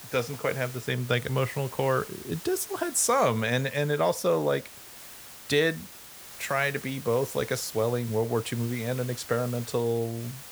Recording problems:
hiss; noticeable; throughout; 15 dB below the speech

